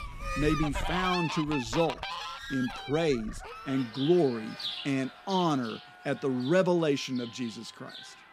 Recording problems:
animal sounds; loud; throughout; 8 dB below the speech

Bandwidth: 15 kHz